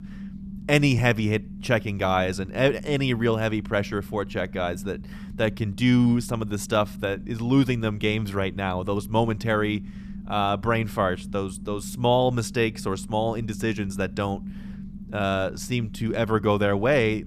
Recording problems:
low rumble; faint; throughout; 20 dB below the speech

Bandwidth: 14.5 kHz